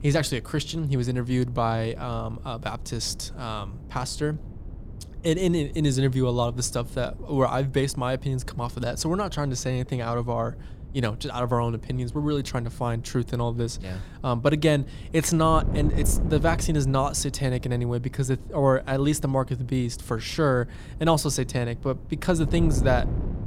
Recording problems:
wind noise on the microphone; occasional gusts; 20 dB below the speech

